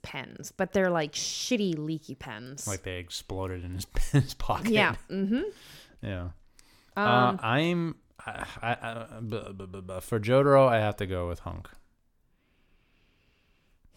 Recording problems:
none

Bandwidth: 17.5 kHz